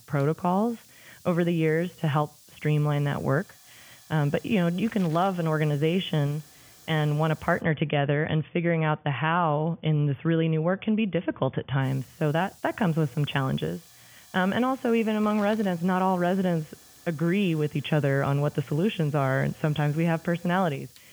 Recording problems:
high frequencies cut off; severe; nothing above 3.5 kHz
hiss; faint; until 7.5 s and from 12 s on; 25 dB below the speech

